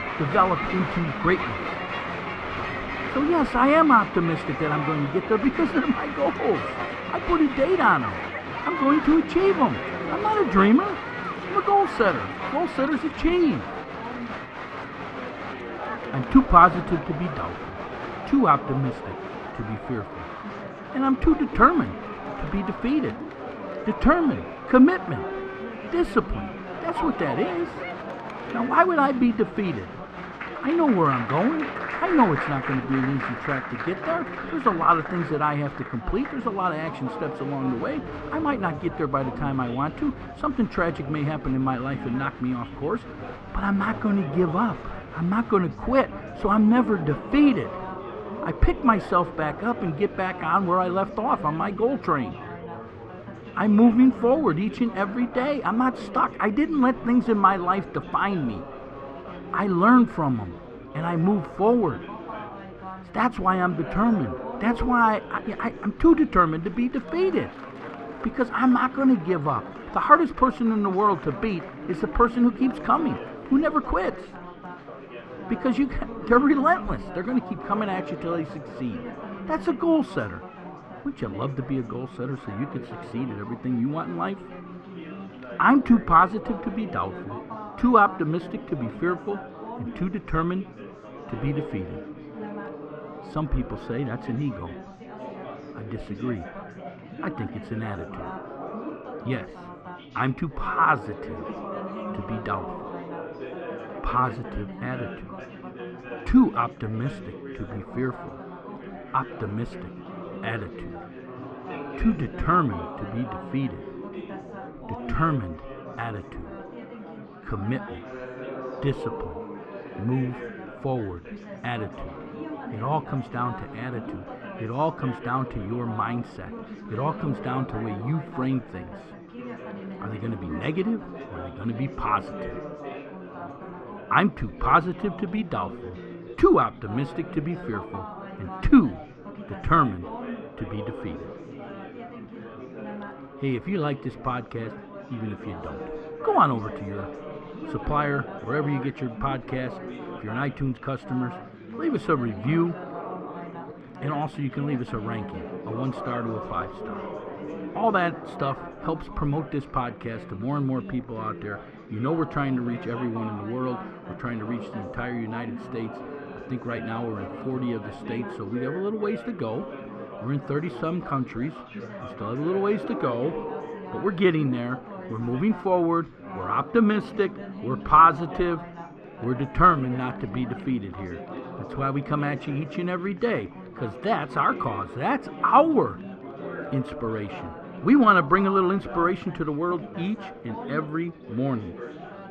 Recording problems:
muffled; very; fading above 2 kHz
crowd noise; noticeable; throughout; 10 dB below the speech
chatter from many people; noticeable; throughout; 15 dB below the speech

